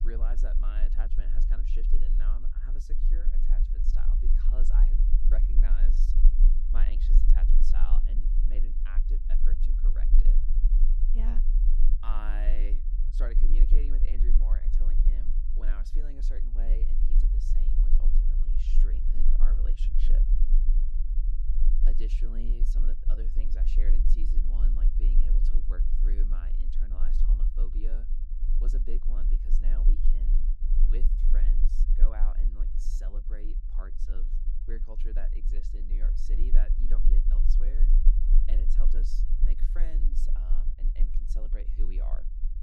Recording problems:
low rumble; loud; throughout; 4 dB below the speech

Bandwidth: 14 kHz